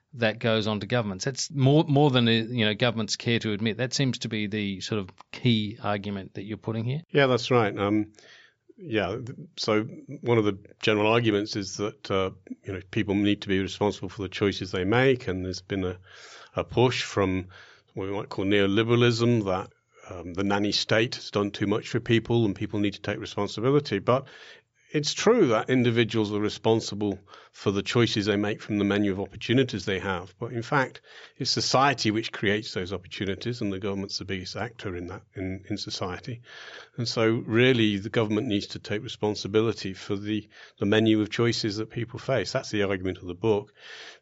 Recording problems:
high frequencies cut off; noticeable; nothing above 8 kHz

